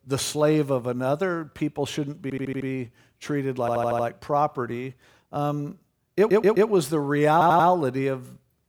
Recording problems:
audio stuttering; 4 times, first at 2 s

